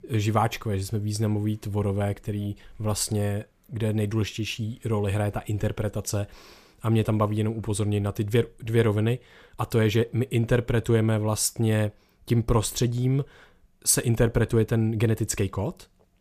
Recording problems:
none

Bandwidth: 14.5 kHz